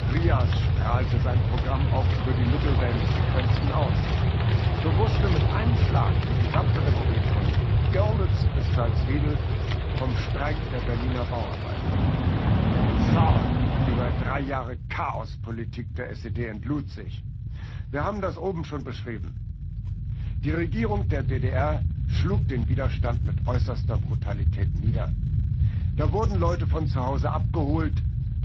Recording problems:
garbled, watery; slightly
animal sounds; very loud; until 14 s; 2 dB above the speech
low rumble; loud; throughout; 9 dB below the speech

